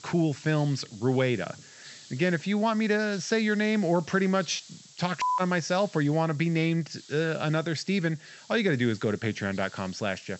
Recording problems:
high frequencies cut off; noticeable; nothing above 8 kHz
hiss; faint; throughout; 20 dB below the speech

